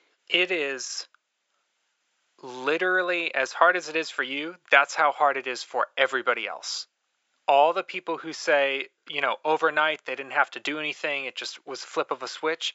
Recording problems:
thin; very; fading below 500 Hz
high frequencies cut off; noticeable; nothing above 8 kHz

